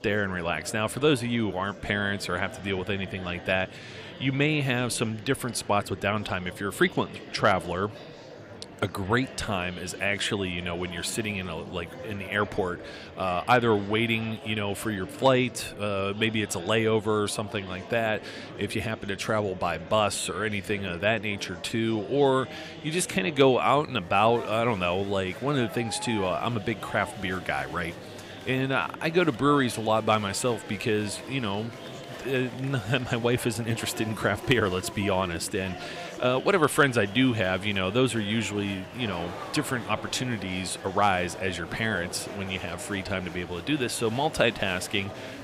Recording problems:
murmuring crowd; noticeable; throughout; 15 dB below the speech

